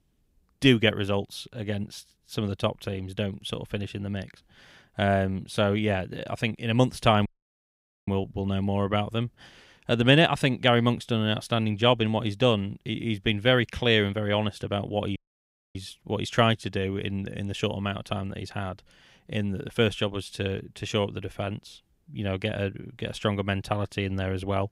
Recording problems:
audio cutting out; at 7.5 s for 1 s and at 15 s for 0.5 s

